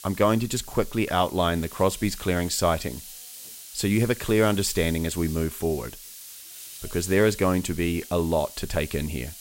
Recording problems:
hiss; noticeable; throughout; 15 dB below the speech

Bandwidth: 16 kHz